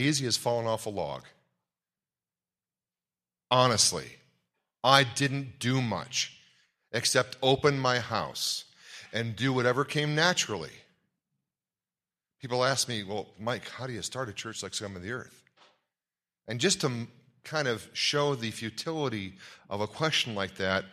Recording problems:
abrupt cut into speech; at the start

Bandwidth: 14.5 kHz